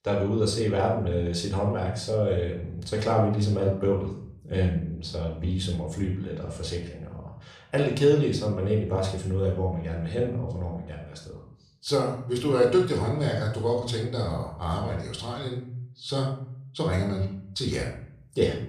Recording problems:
room echo; noticeable; dies away in 0.6 s
off-mic speech; somewhat distant

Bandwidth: 15 kHz